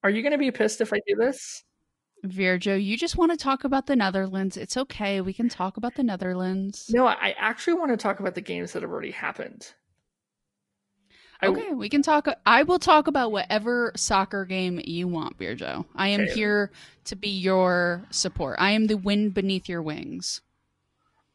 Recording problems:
garbled, watery; slightly; nothing above 10.5 kHz

